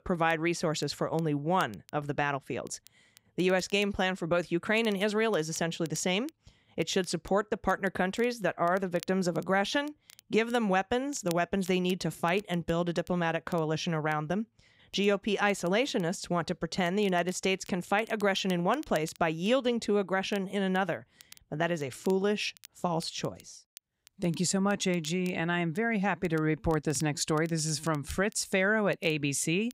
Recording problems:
crackle, like an old record; faint; 25 dB below the speech

